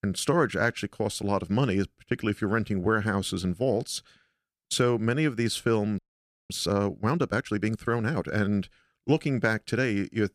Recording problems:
audio freezing; at 6 s for 0.5 s

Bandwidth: 14.5 kHz